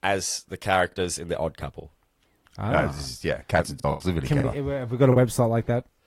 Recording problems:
garbled, watery; slightly; nothing above 16 kHz
choppy; very; 5% of the speech affected

